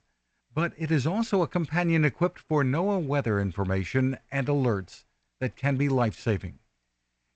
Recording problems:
garbled, watery; slightly; nothing above 8 kHz

